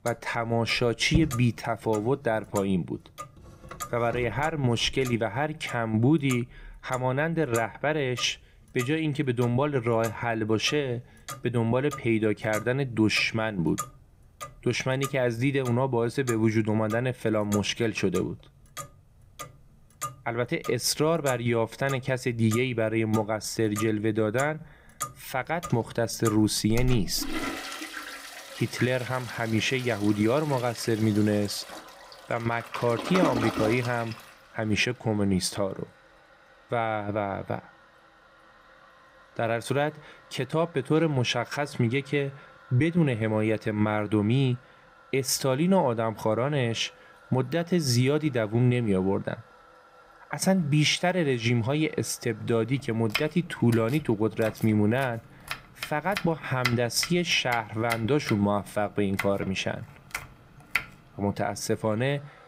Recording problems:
household noises; noticeable; throughout; 10 dB below the speech

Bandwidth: 15.5 kHz